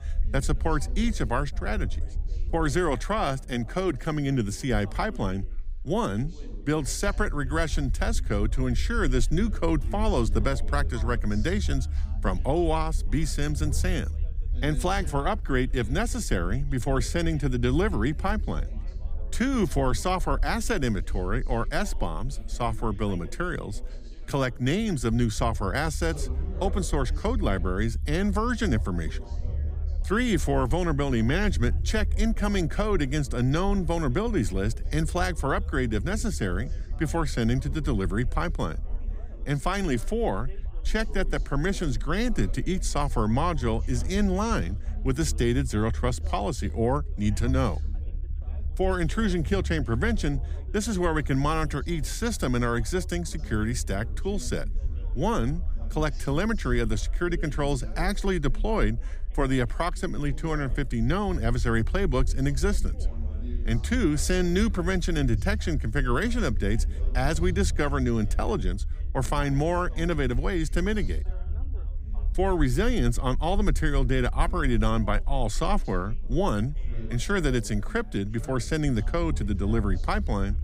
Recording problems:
background chatter; faint; throughout; 4 voices, 20 dB below the speech
low rumble; faint; throughout; 25 dB below the speech

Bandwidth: 15.5 kHz